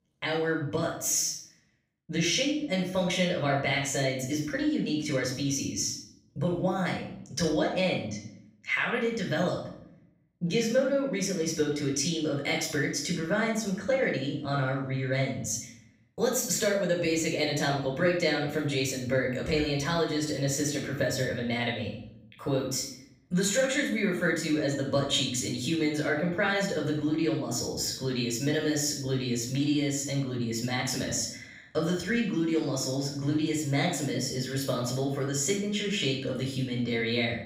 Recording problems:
off-mic speech; far
room echo; noticeable; dies away in 0.6 s

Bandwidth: 15.5 kHz